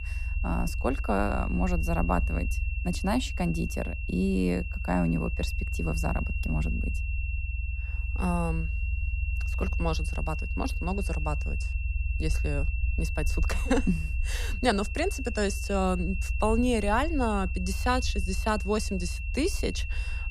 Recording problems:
high-pitched whine; loud; throughout; 2.5 kHz, 9 dB below the speech
low rumble; faint; throughout; 20 dB below the speech

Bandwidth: 15 kHz